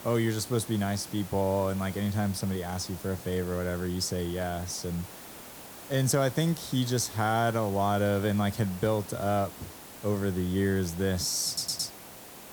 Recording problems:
hiss; noticeable; throughout; 15 dB below the speech
audio stuttering; at 11 s

